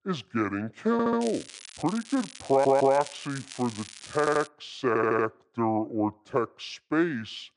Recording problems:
wrong speed and pitch; too slow and too low; 0.7 times normal speed
crackling; noticeable; from 1 to 4.5 s; 15 dB below the speech
audio stuttering; 4 times, first at 1 s

